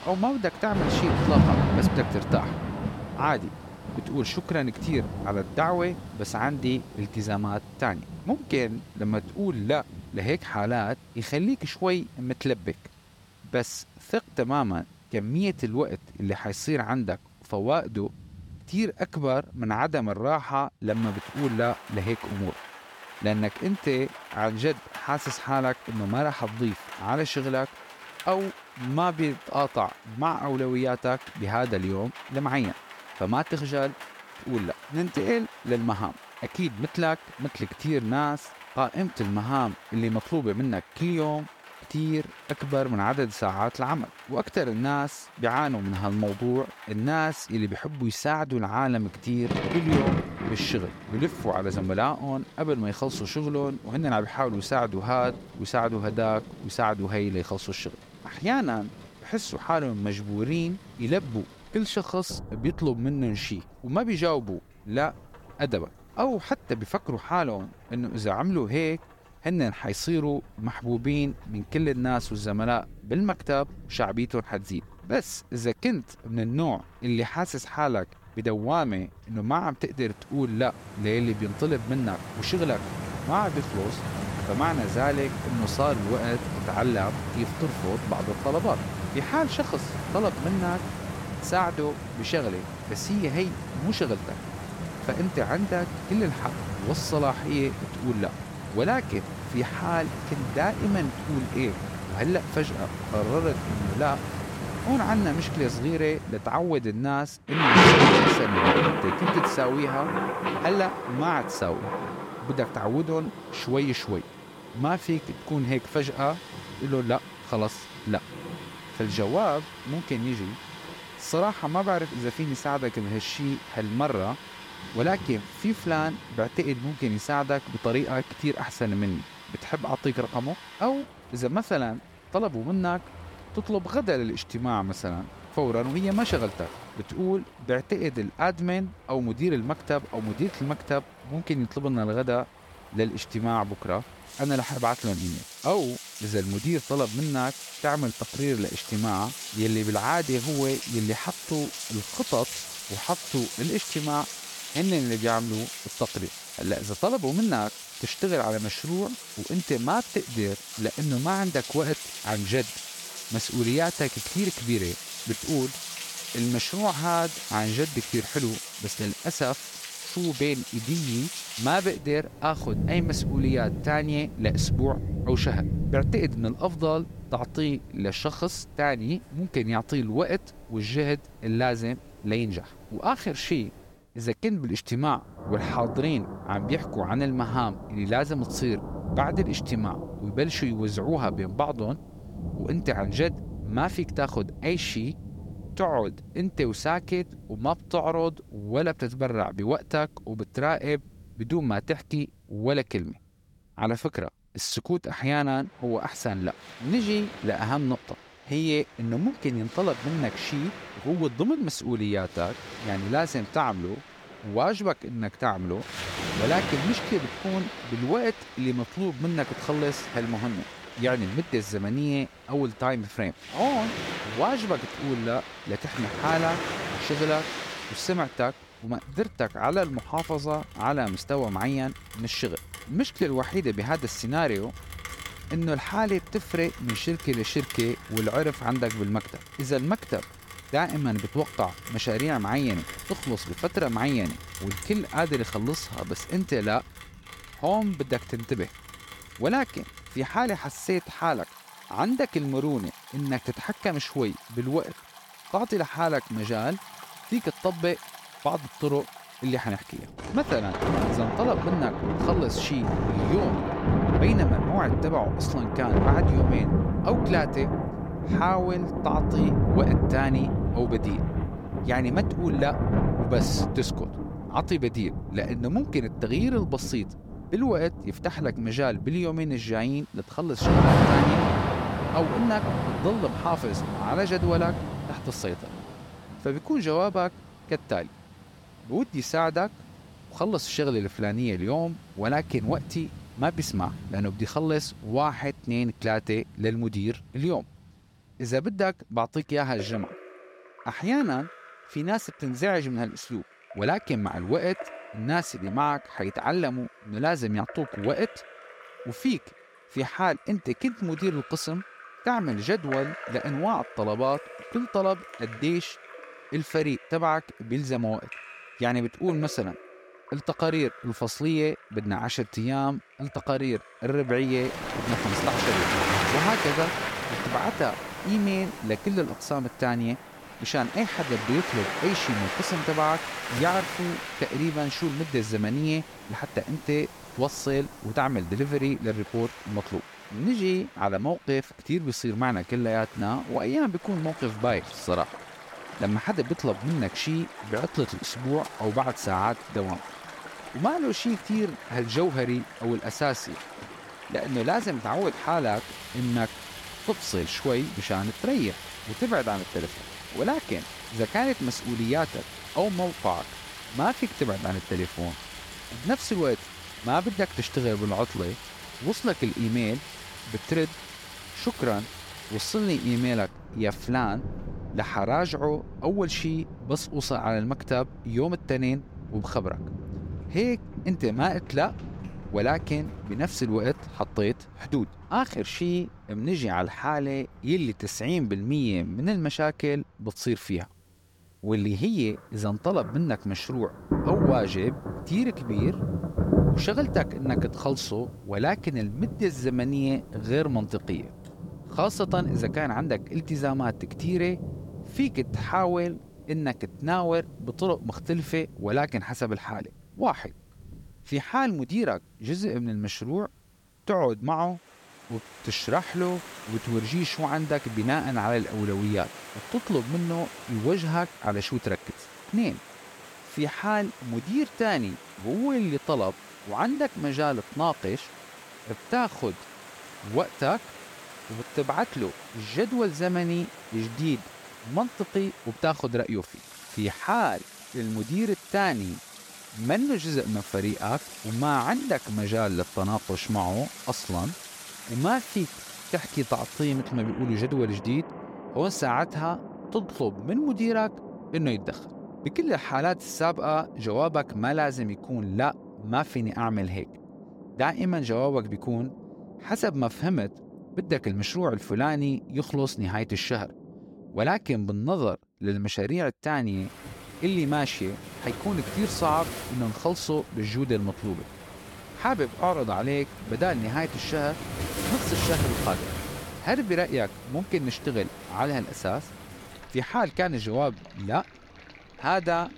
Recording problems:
rain or running water; loud; throughout; 5 dB below the speech

